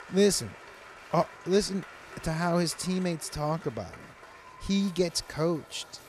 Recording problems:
crowd noise; noticeable; throughout; 20 dB below the speech

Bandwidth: 14.5 kHz